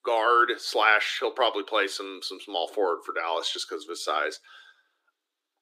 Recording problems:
thin; very; fading below 300 Hz

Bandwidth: 15 kHz